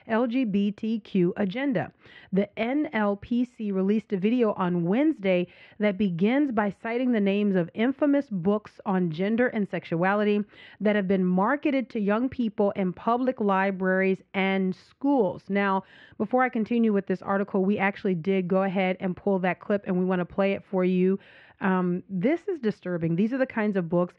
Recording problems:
muffled; very; fading above 2.5 kHz

